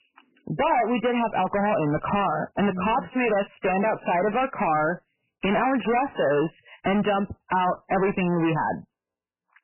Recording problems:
distortion; heavy; 5 dB below the speech
garbled, watery; badly; nothing above 3 kHz

